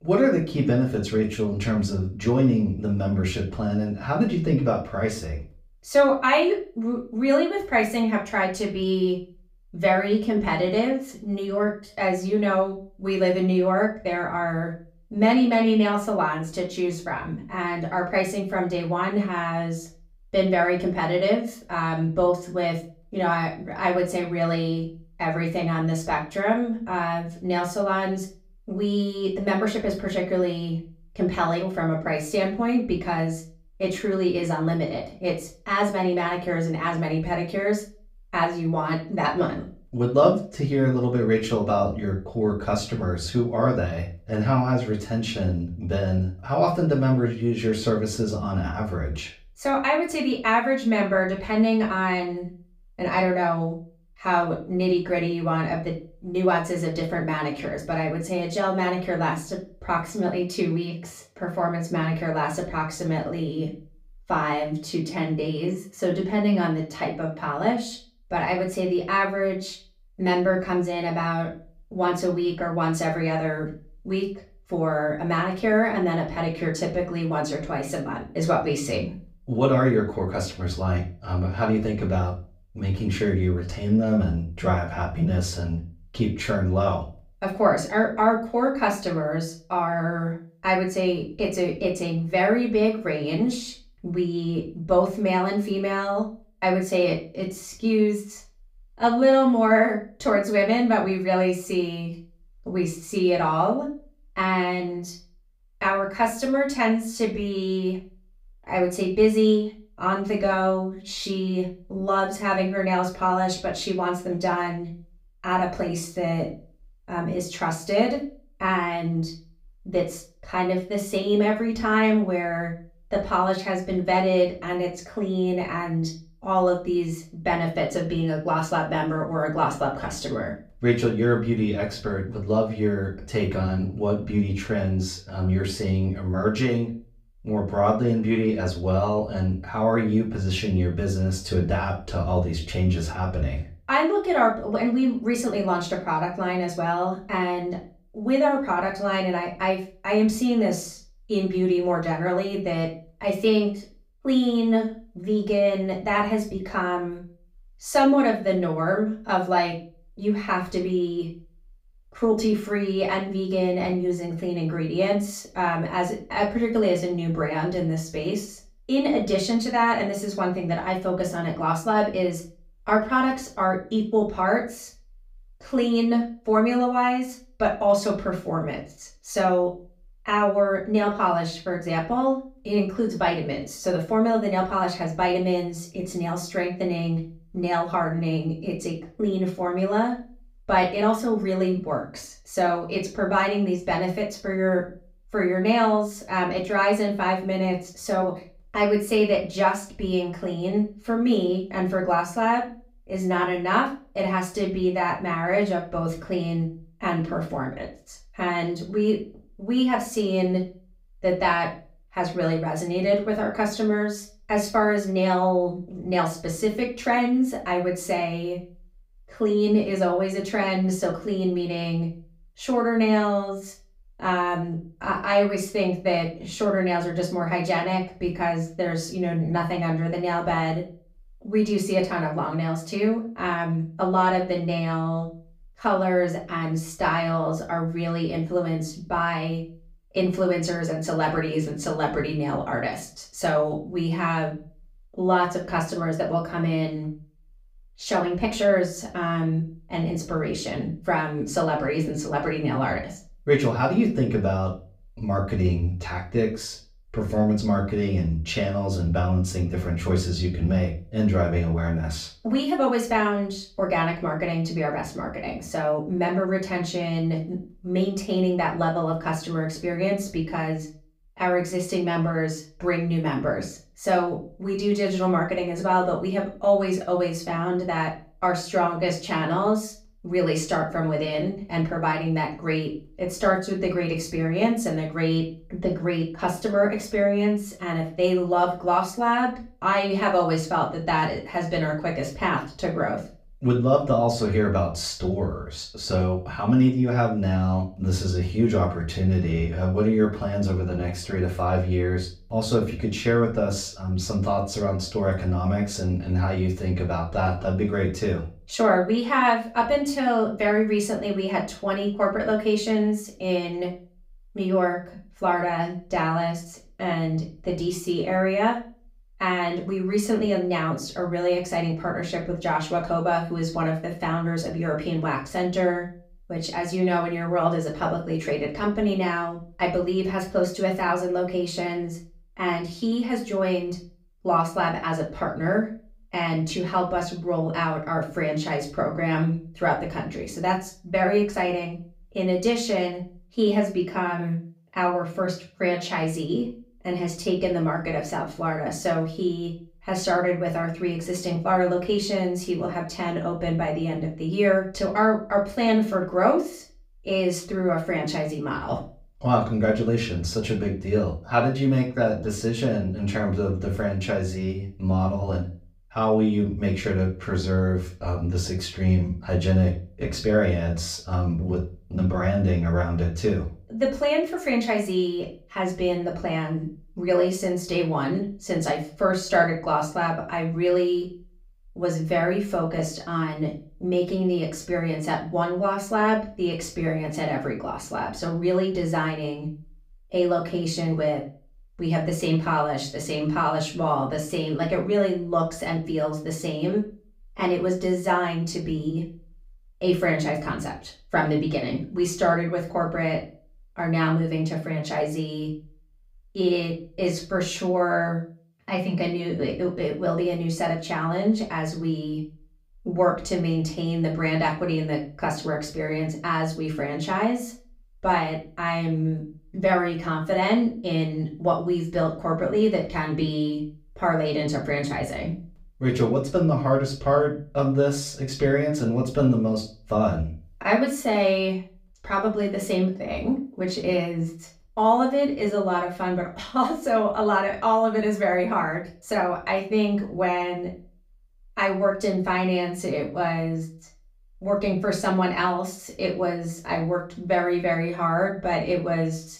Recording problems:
off-mic speech; far
room echo; slight; dies away in 0.3 s

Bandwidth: 15.5 kHz